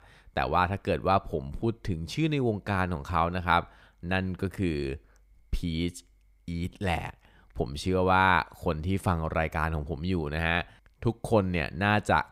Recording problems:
none

